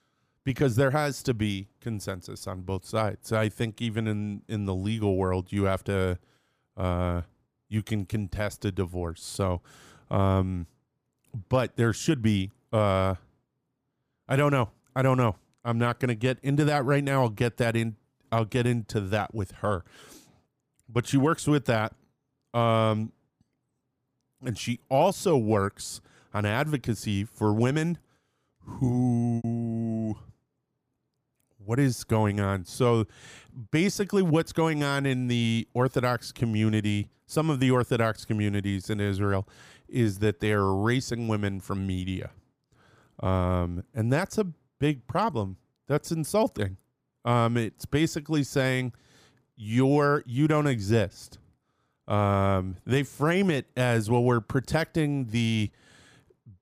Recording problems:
choppy; occasionally; at 29 s; 3% of the speech affected

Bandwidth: 15 kHz